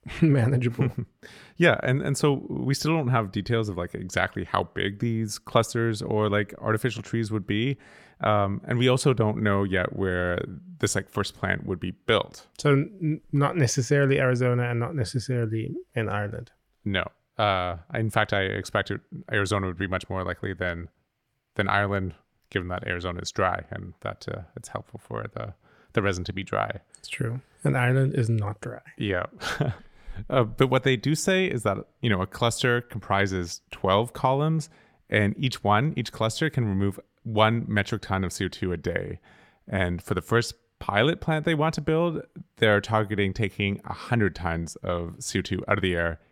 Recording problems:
none

